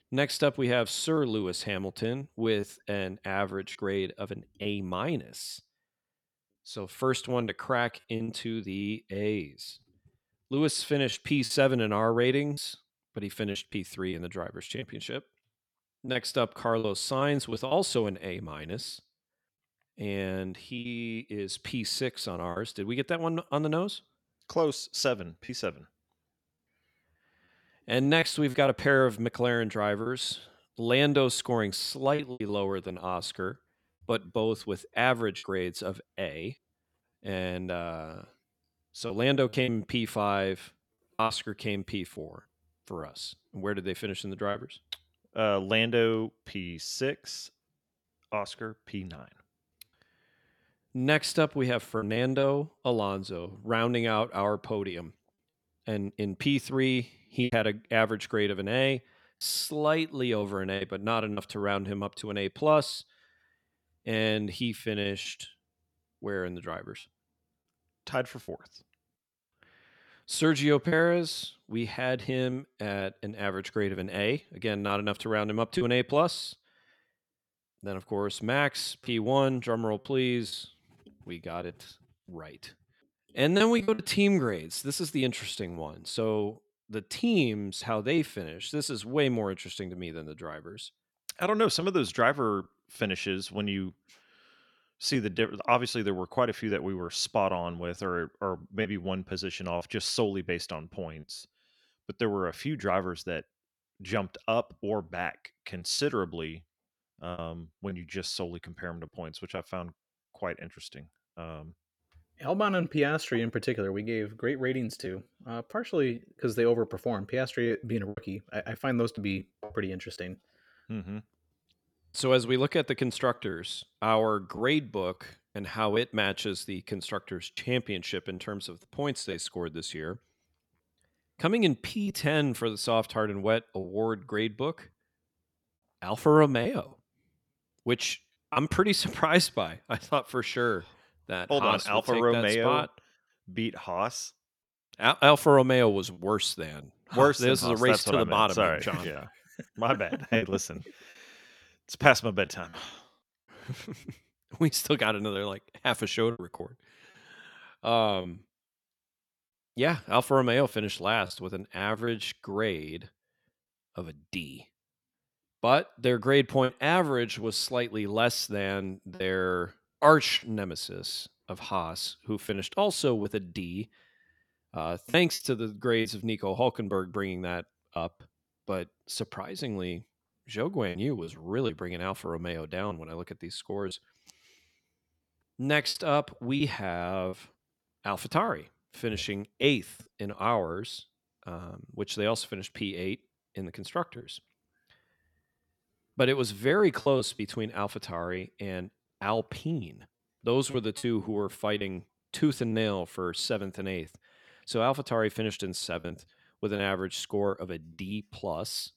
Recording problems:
choppy; occasionally; 4% of the speech affected

